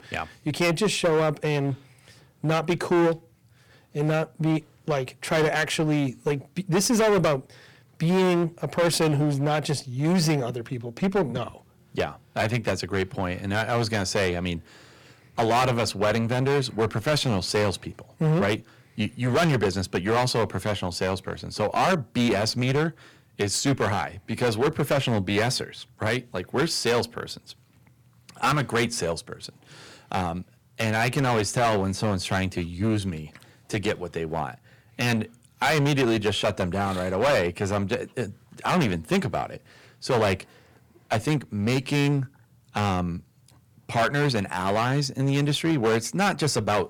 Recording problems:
distortion; heavy; 11% of the sound clipped

